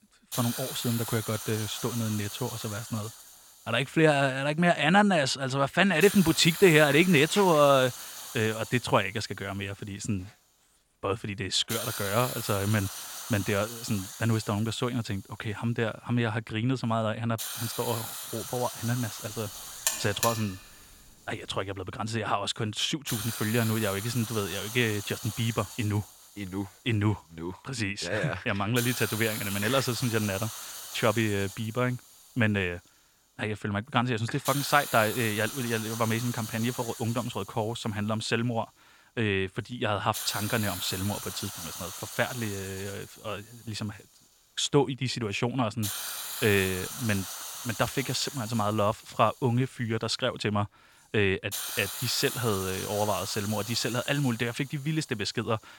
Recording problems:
hiss; loud; throughout; 8 dB below the speech
alarm; noticeable; at 20 s; peak 1 dB below the speech

